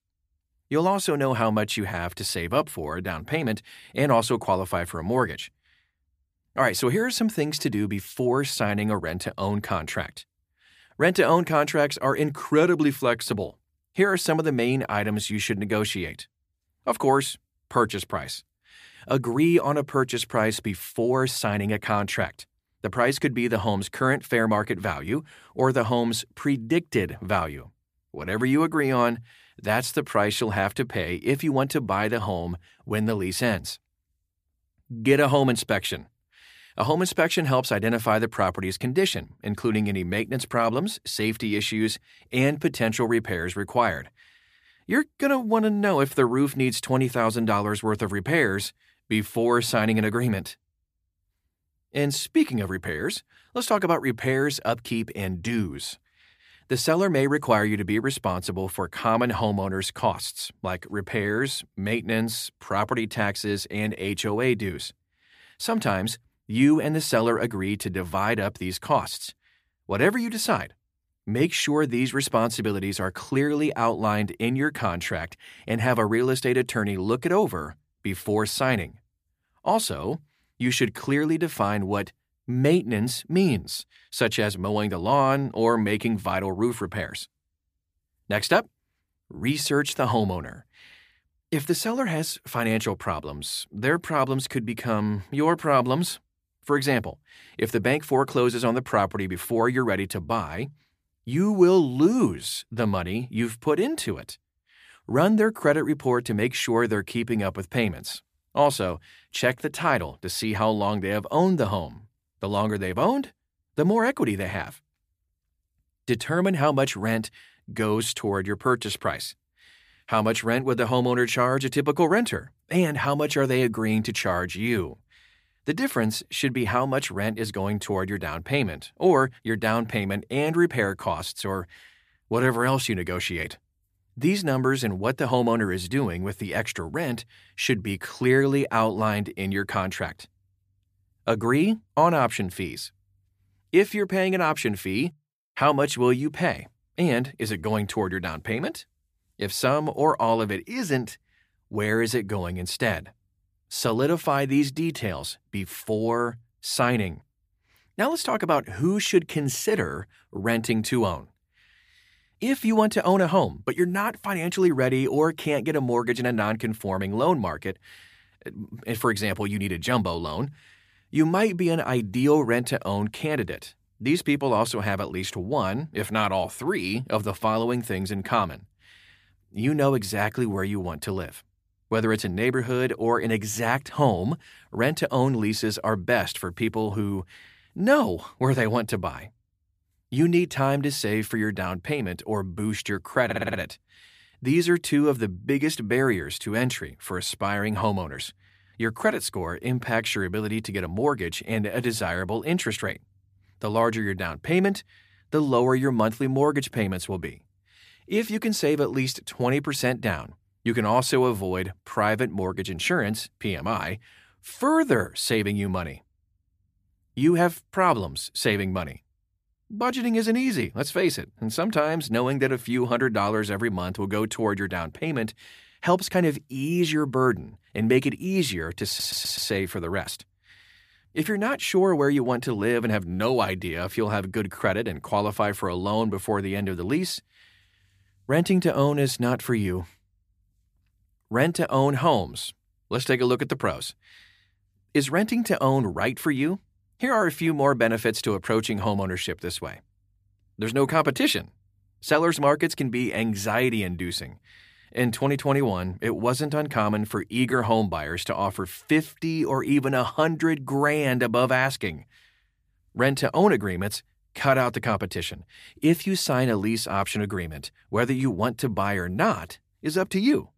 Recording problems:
audio stuttering; at 3:13 and at 3:49

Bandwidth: 15 kHz